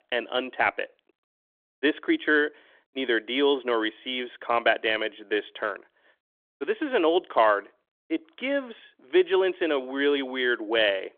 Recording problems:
phone-call audio; nothing above 3.5 kHz

